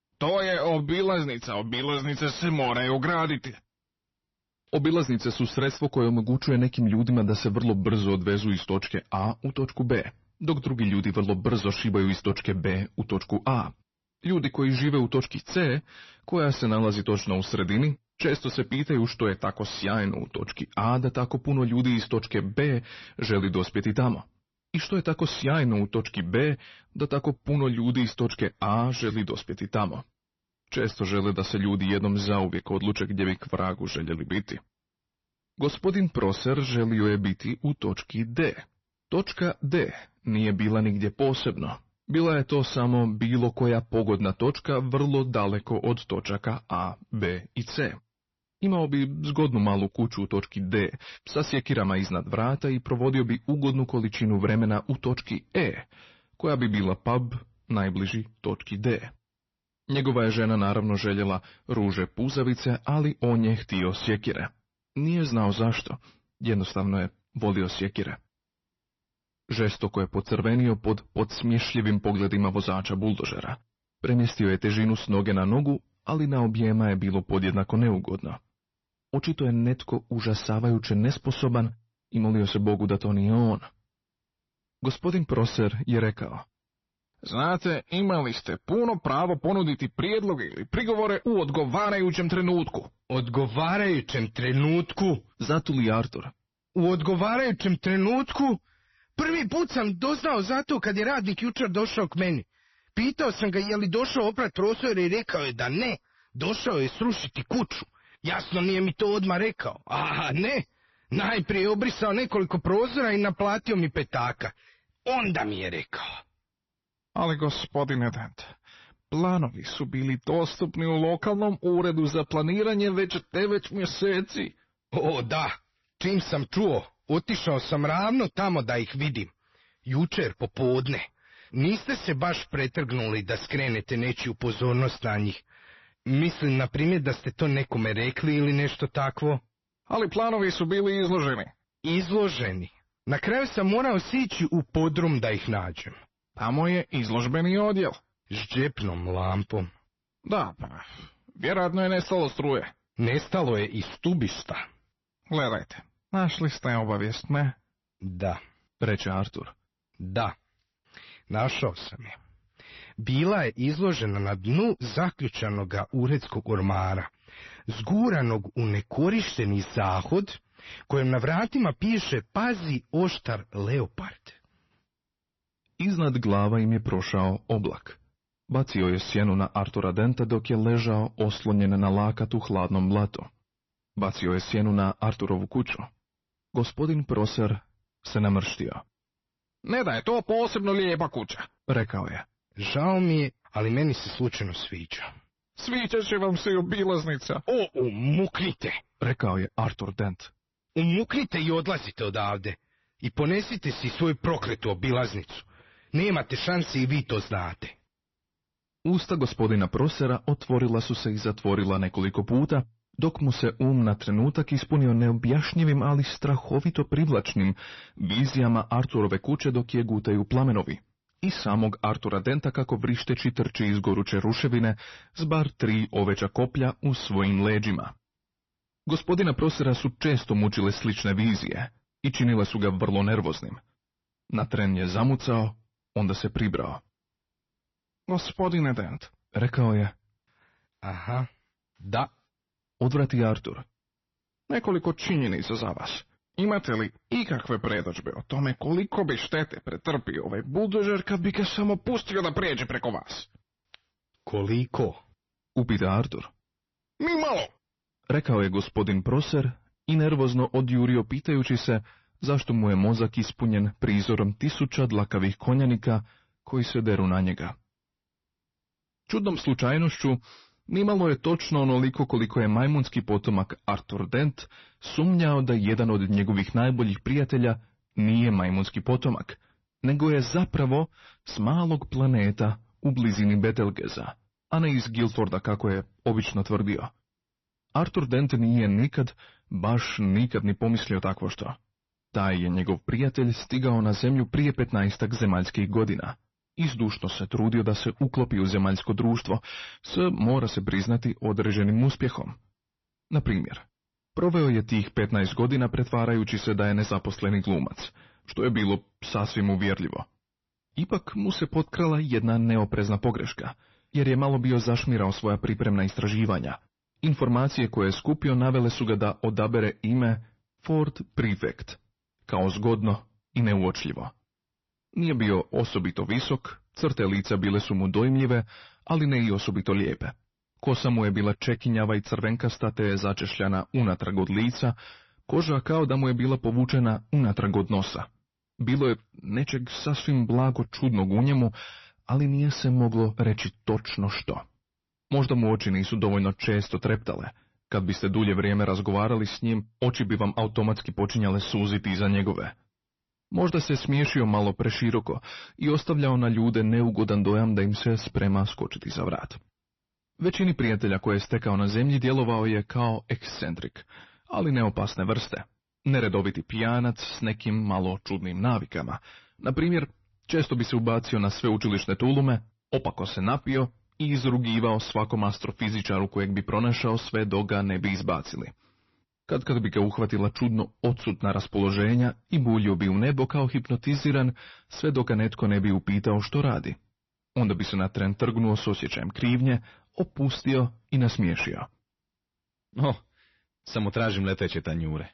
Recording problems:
distortion; slight; 10 dB below the speech
garbled, watery; slightly; nothing above 6 kHz

